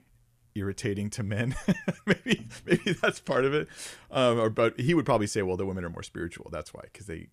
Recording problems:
none

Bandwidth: 14.5 kHz